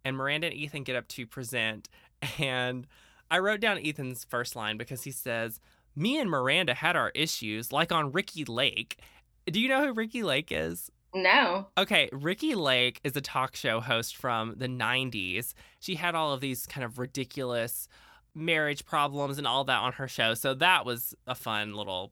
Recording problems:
none

